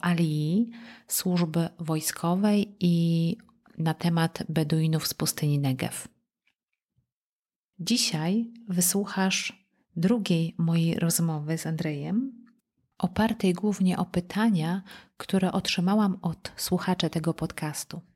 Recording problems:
none

